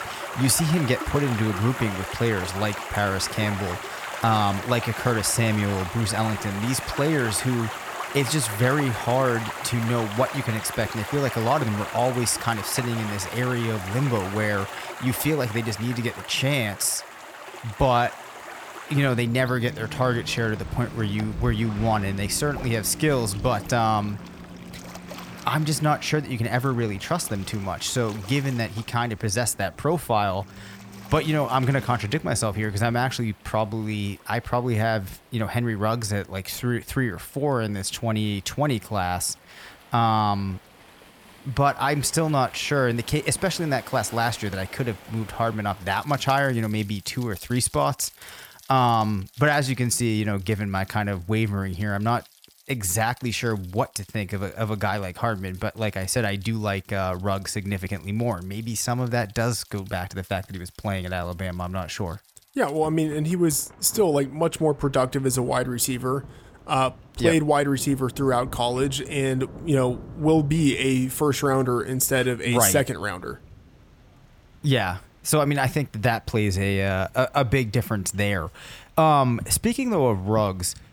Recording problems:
rain or running water; noticeable; throughout; 10 dB below the speech

